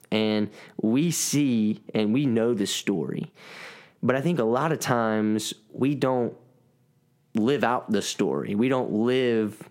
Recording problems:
squashed, flat; somewhat

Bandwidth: 16 kHz